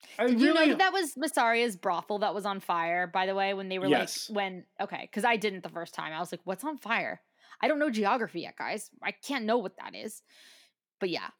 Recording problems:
none

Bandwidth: 17.5 kHz